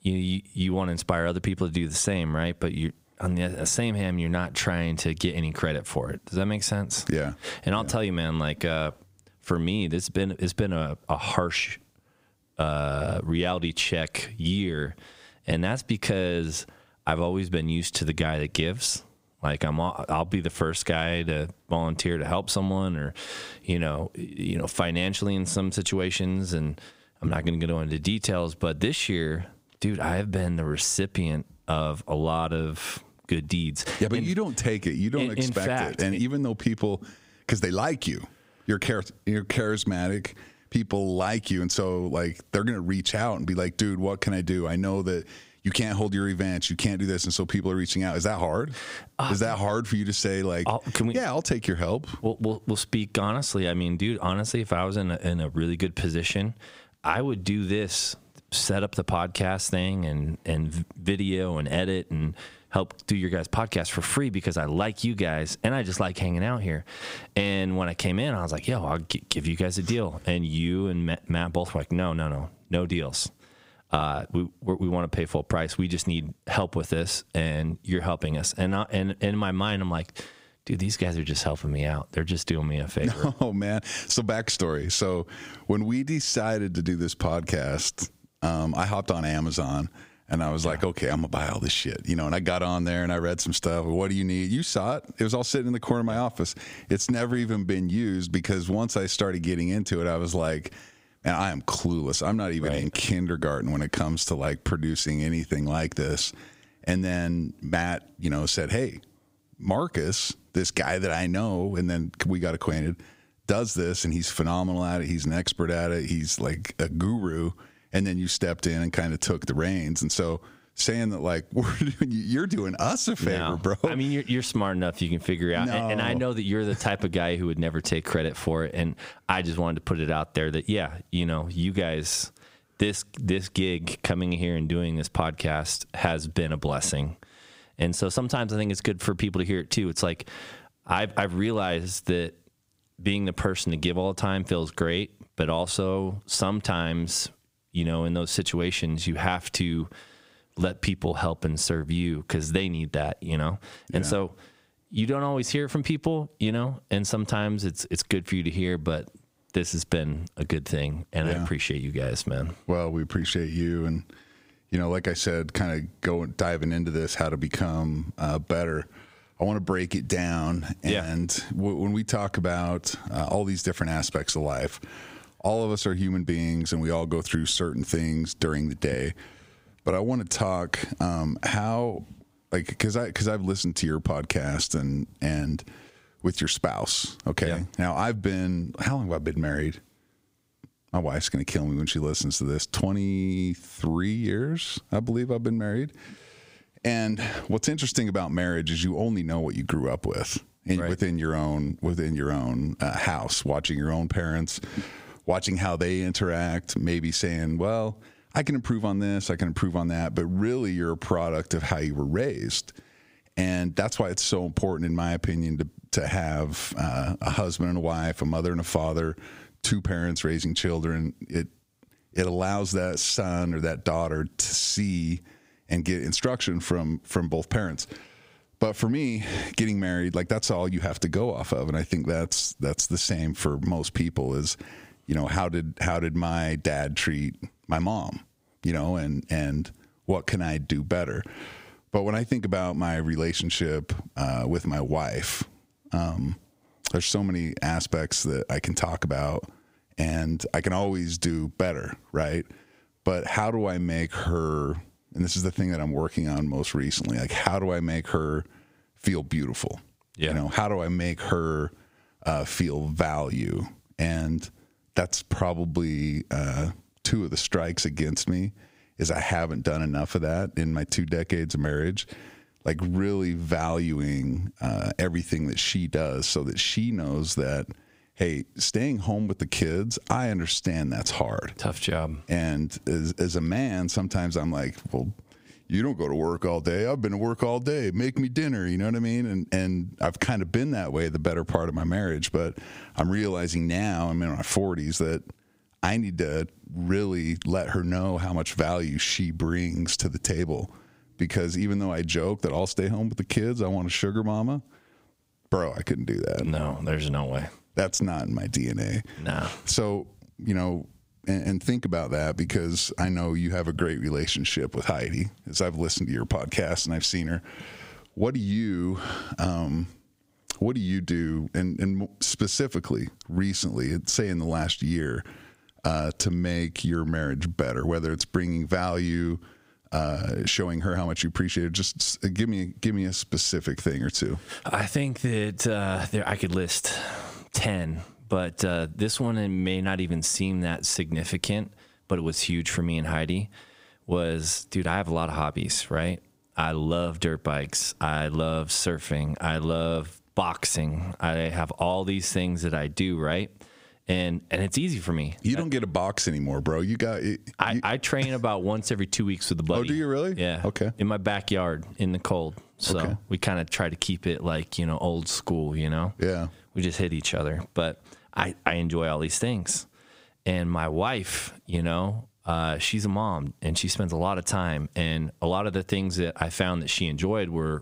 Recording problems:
squashed, flat; heavily

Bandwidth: 15.5 kHz